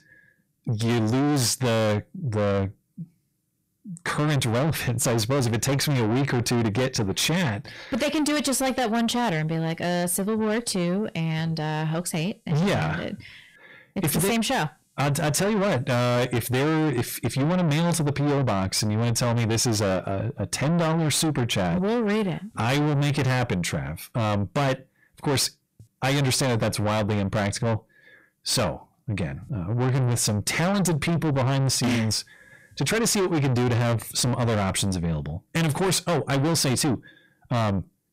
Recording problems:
distortion; heavy; 6 dB below the speech

